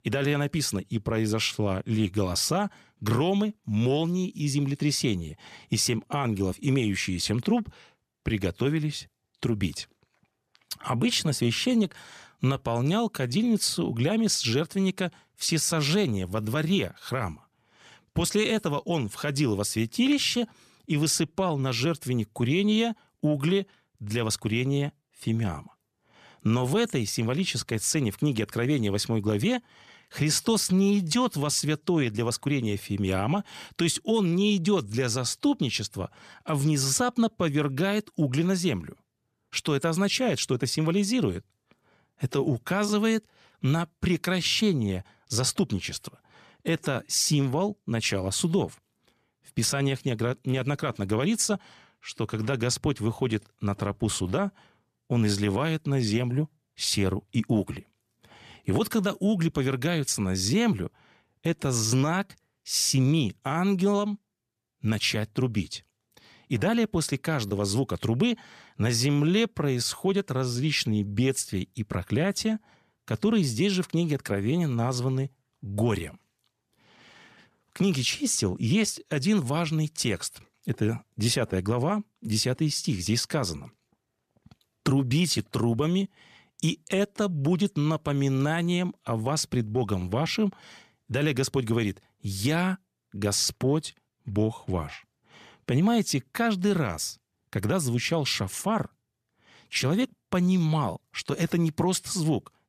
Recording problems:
none

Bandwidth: 14.5 kHz